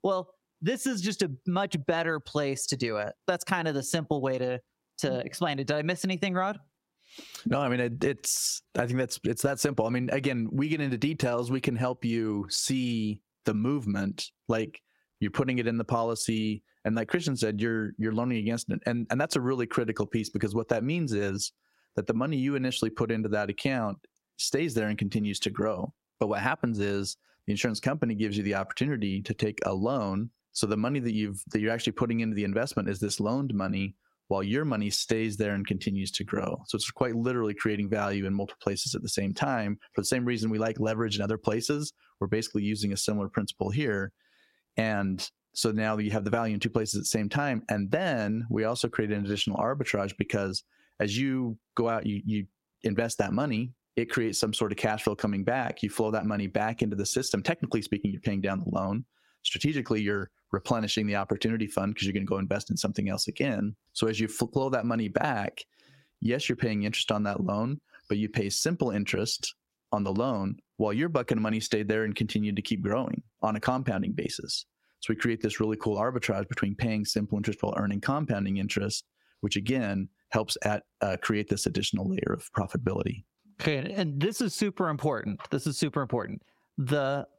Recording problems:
squashed, flat; heavily

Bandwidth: 16 kHz